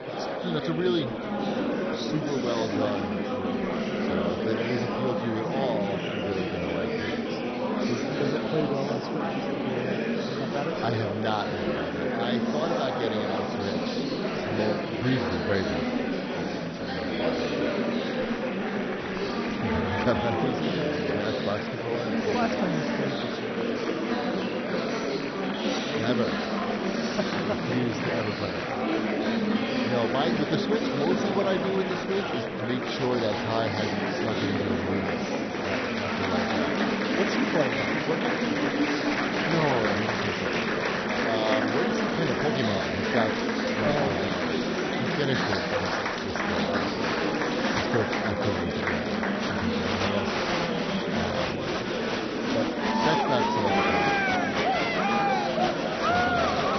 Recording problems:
garbled, watery; badly; nothing above 6 kHz
murmuring crowd; very loud; throughout; 5 dB above the speech

